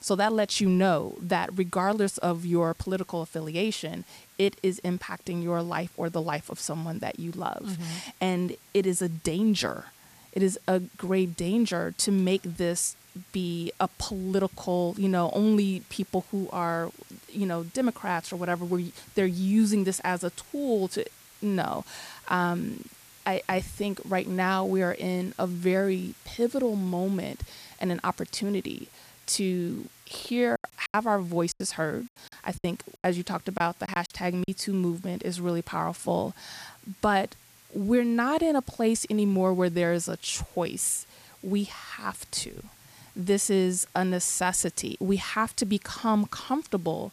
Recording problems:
hiss; faint; throughout; 25 dB below the speech
choppy; very; from 31 to 34 s; 13% of the speech affected

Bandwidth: 14.5 kHz